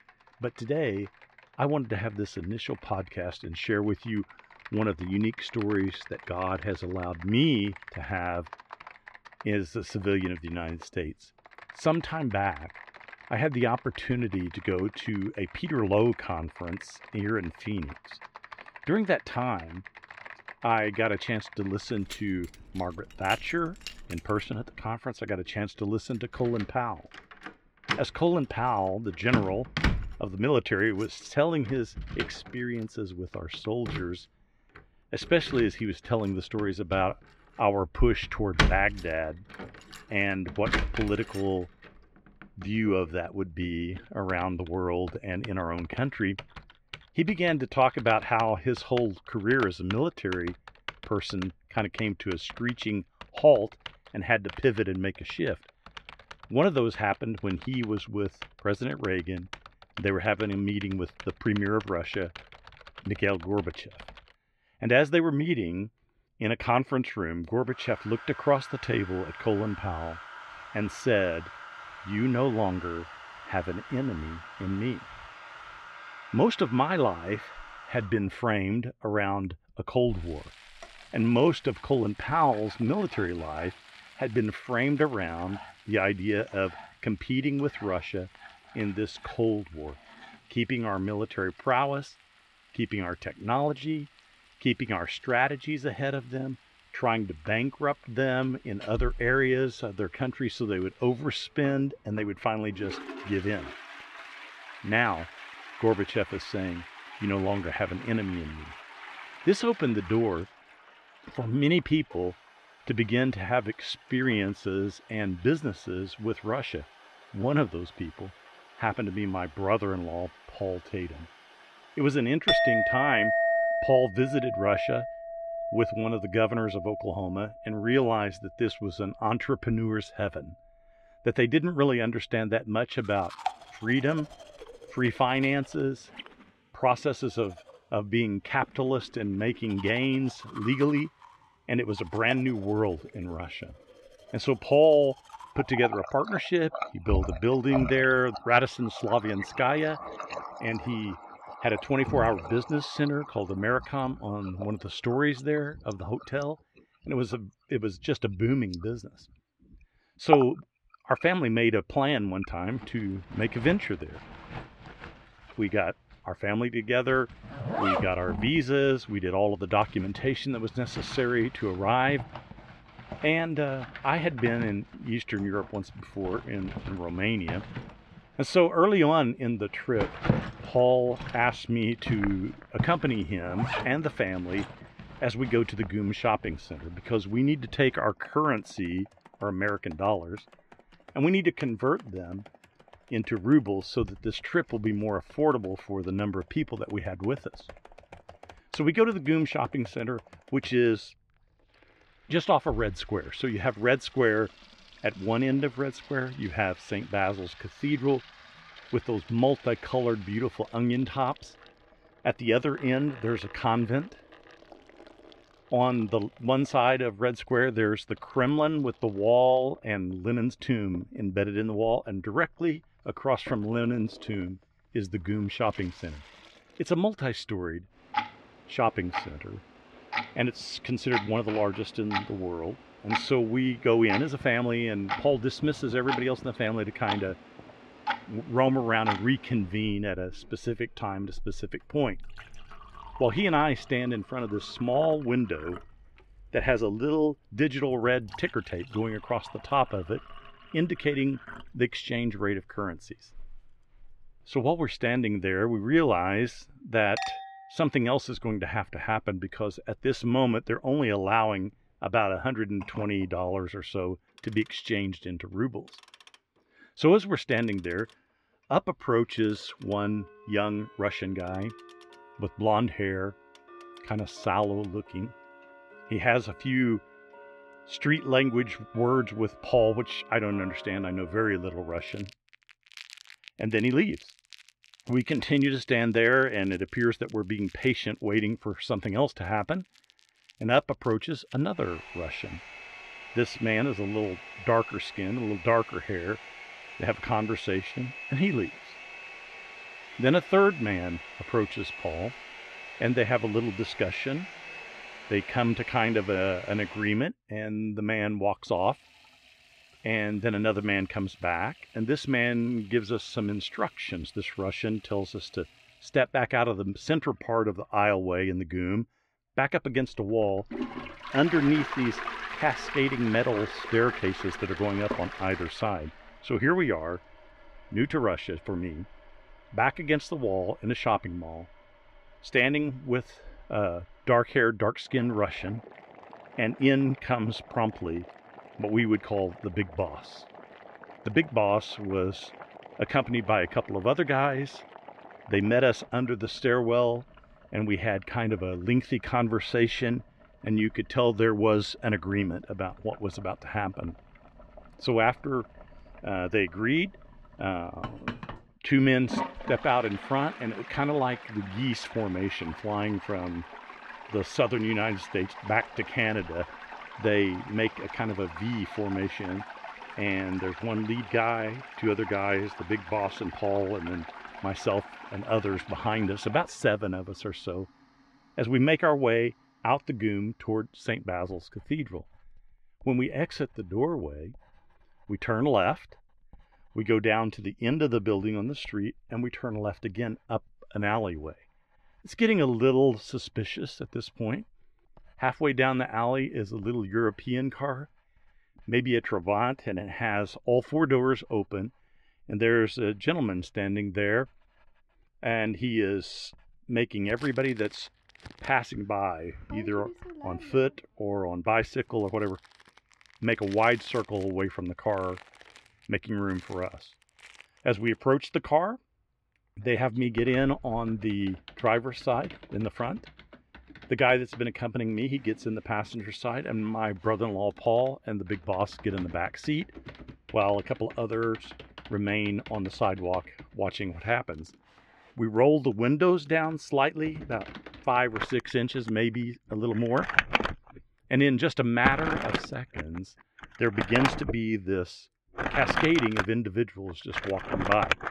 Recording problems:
muffled; slightly; fading above 2.5 kHz
household noises; noticeable; throughout; 10 dB below the speech

